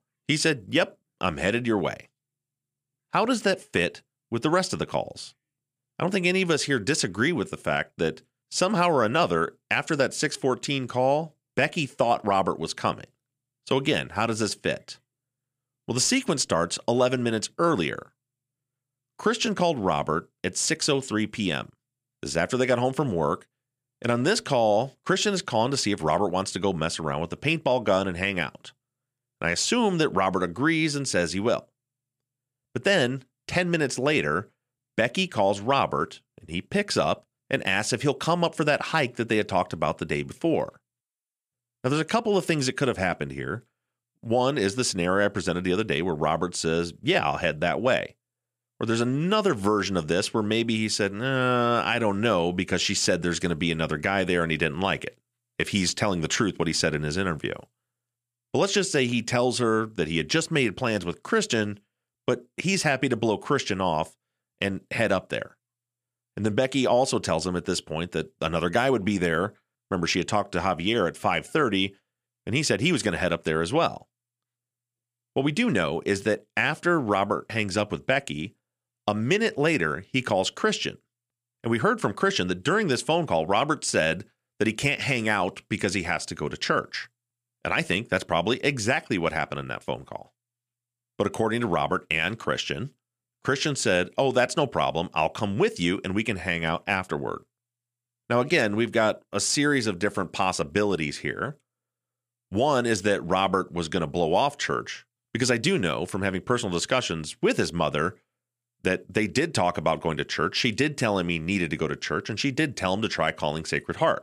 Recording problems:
none

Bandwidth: 15 kHz